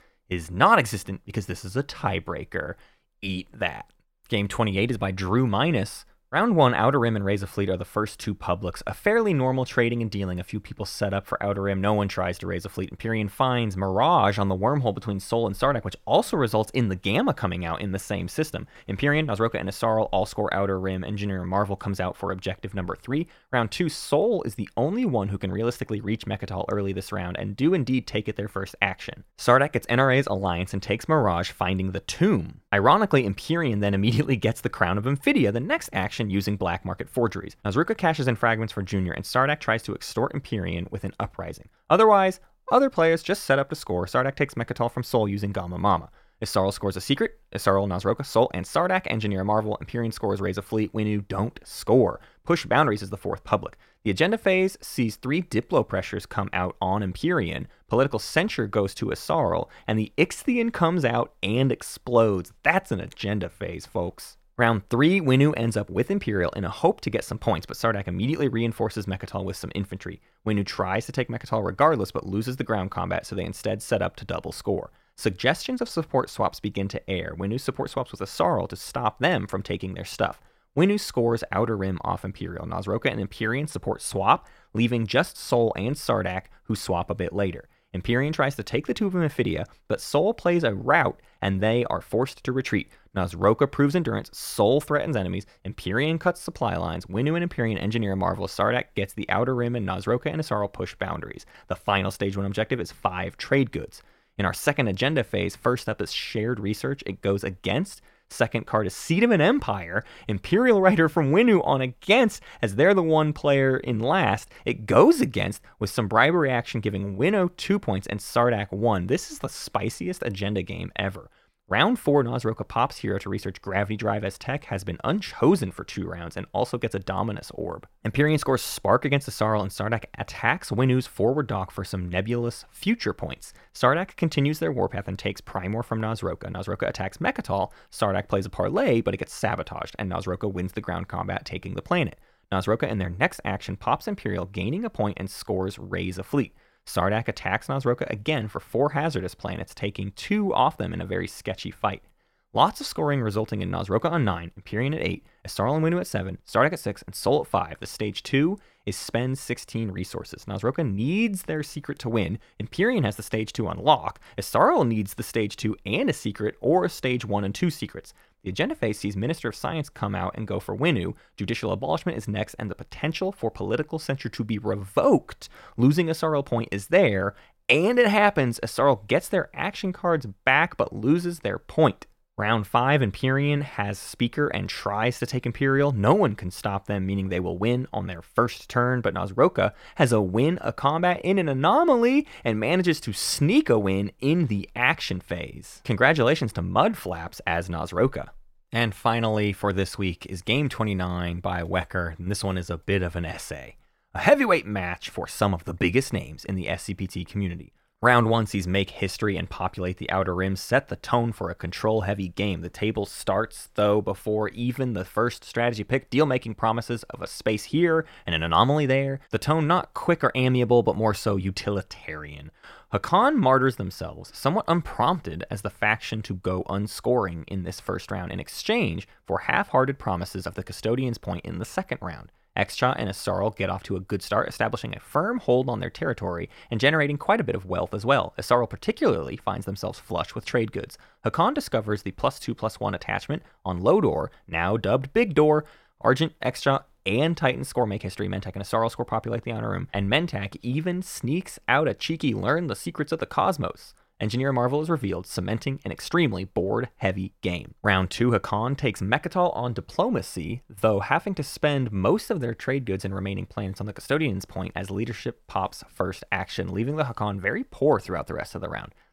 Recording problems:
none

